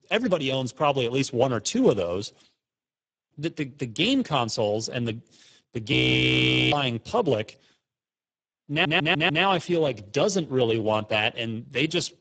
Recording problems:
garbled, watery; badly; nothing above 7.5 kHz
audio freezing; at 6 s for 1 s
audio stuttering; at 8.5 s

